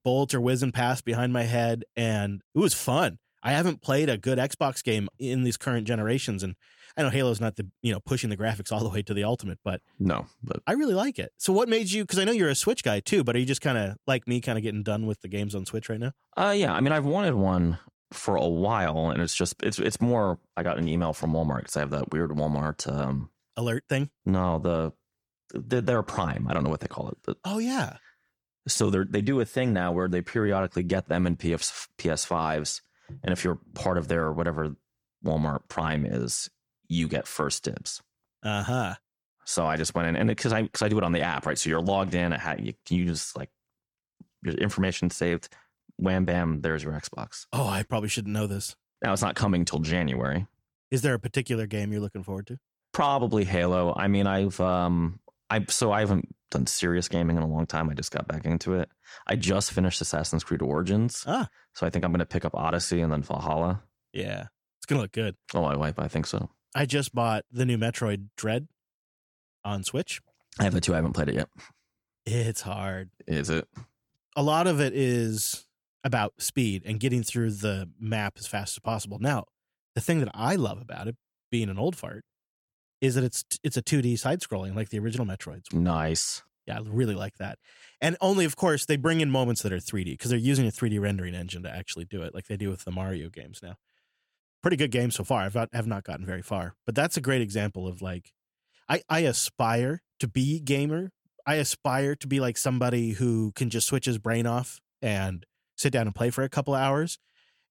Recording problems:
none

